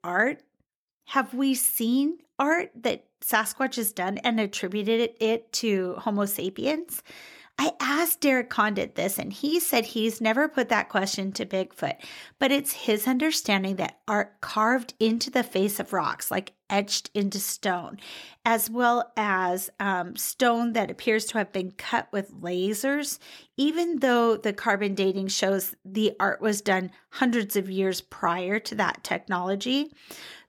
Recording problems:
none

